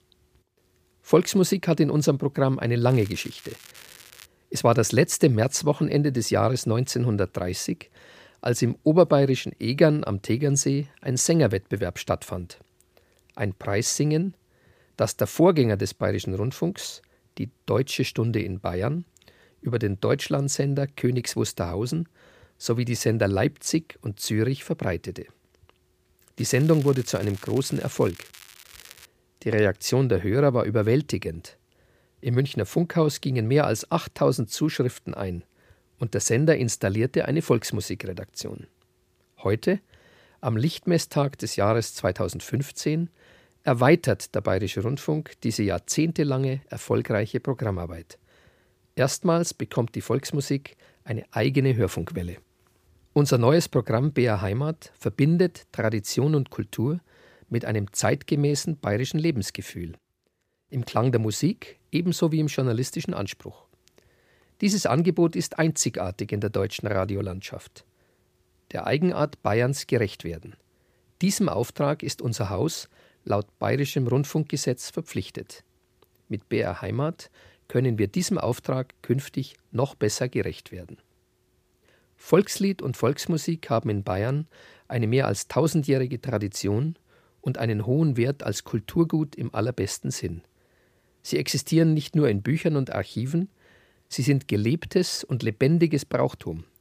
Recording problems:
crackling; faint; from 3 to 4.5 s and from 26 to 29 s; 20 dB below the speech

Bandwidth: 15 kHz